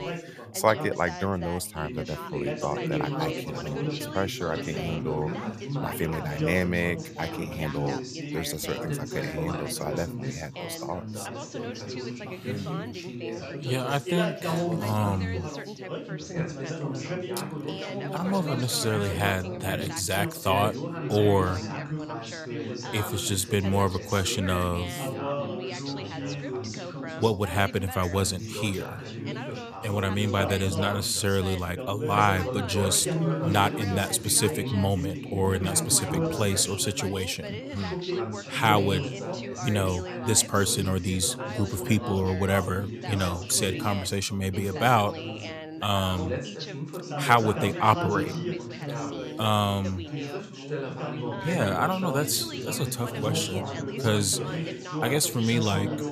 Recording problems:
background chatter; loud; throughout; 3 voices, 6 dB below the speech

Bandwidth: 14.5 kHz